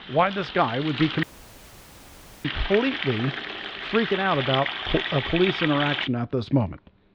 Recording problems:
muffled; slightly; fading above 4 kHz
household noises; loud; throughout; 4 dB below the speech
audio cutting out; at 1 s for 1 s

